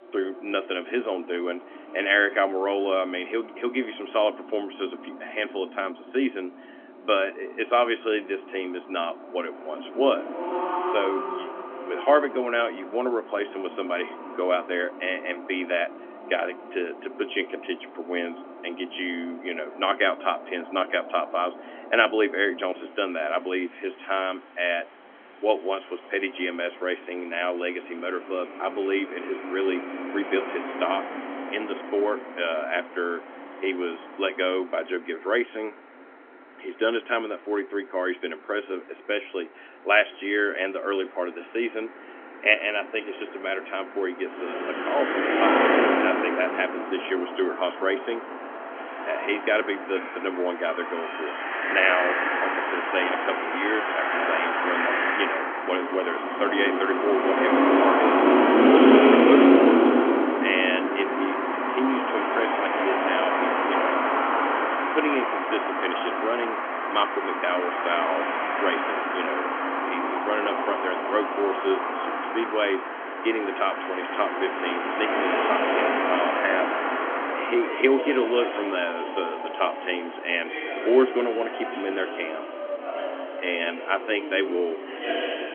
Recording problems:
phone-call audio; nothing above 3.5 kHz
traffic noise; very loud; throughout; 2 dB above the speech

